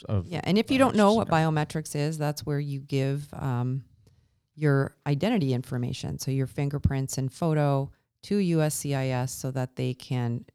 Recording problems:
none

